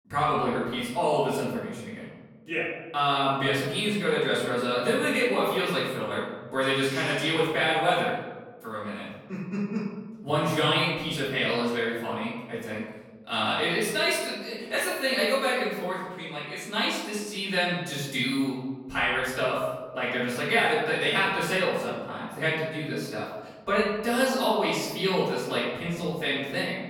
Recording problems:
off-mic speech; far
room echo; noticeable; dies away in 1.2 s

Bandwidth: 18 kHz